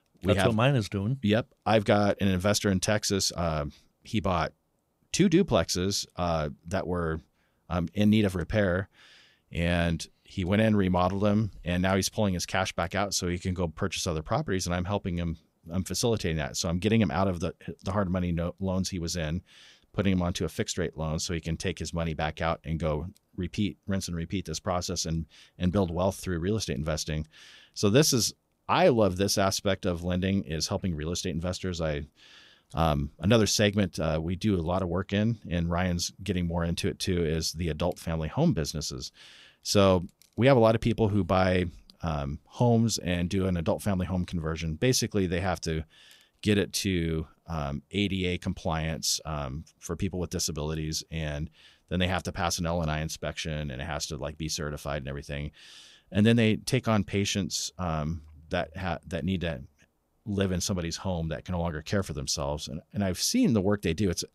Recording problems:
none

